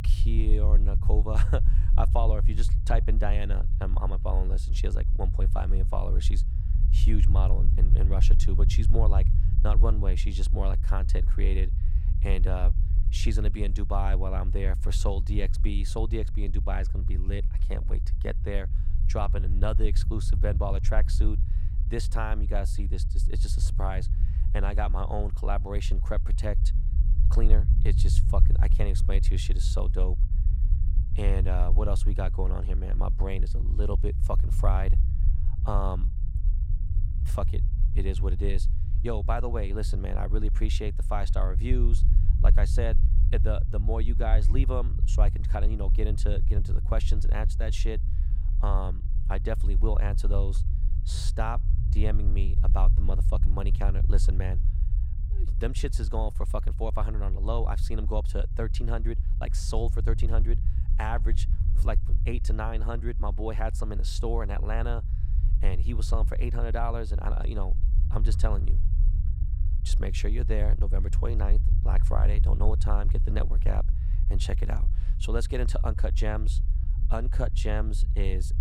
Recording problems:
low rumble; noticeable; throughout; 10 dB below the speech

